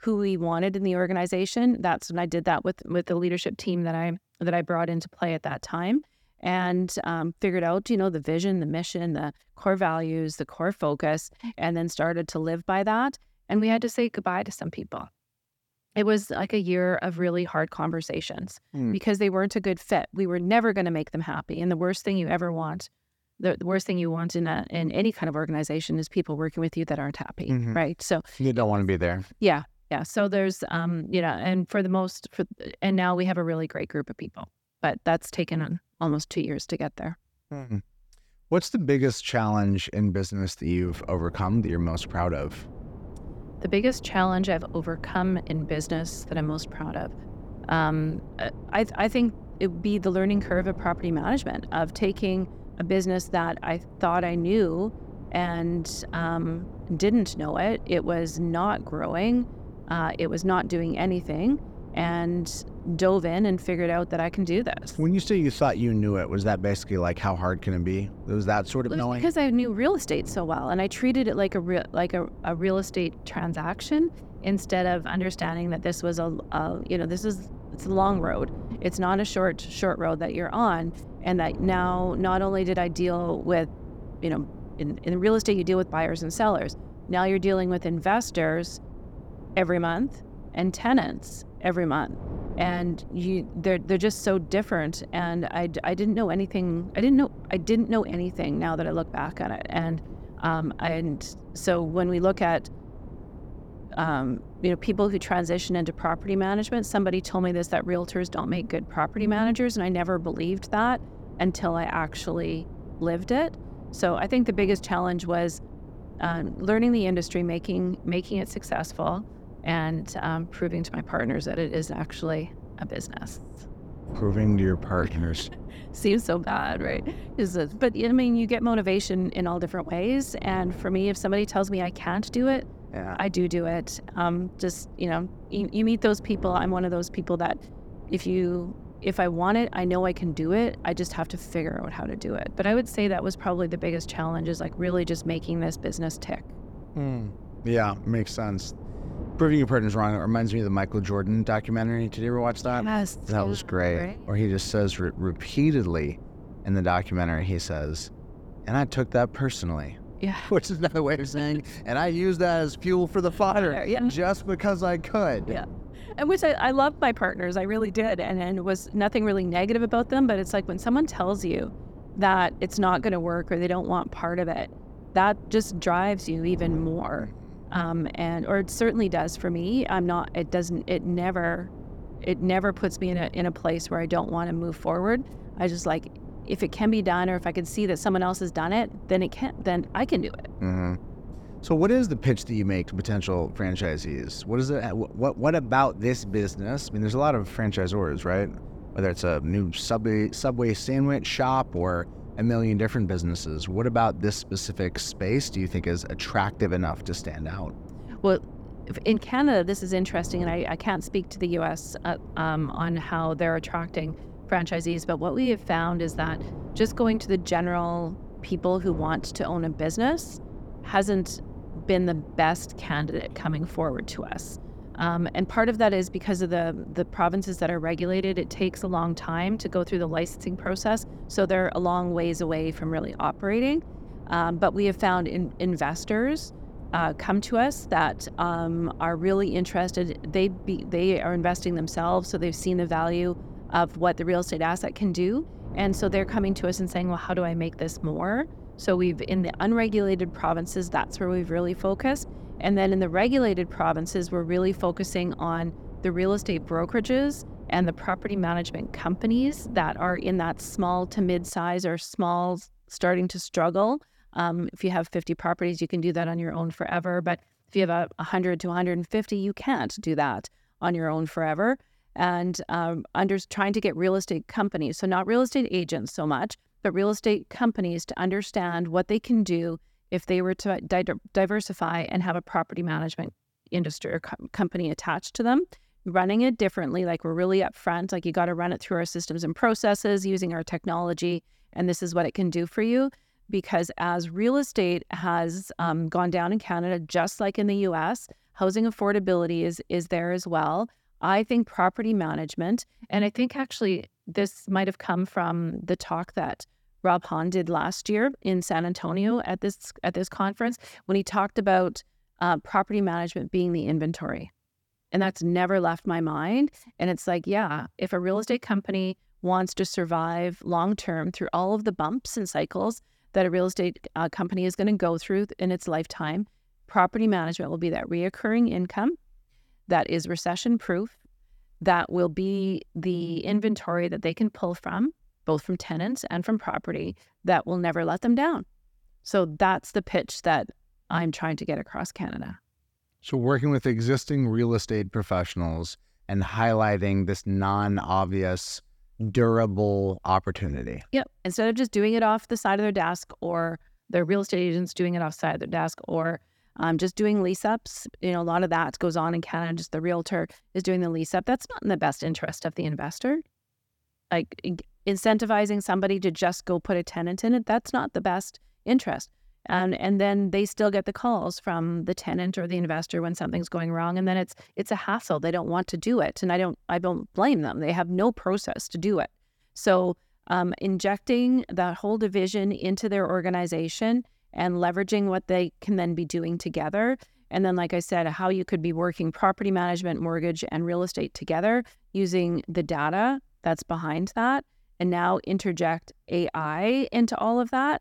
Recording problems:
wind noise on the microphone; occasional gusts; from 41 s to 4:22; 20 dB below the speech

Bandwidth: 18 kHz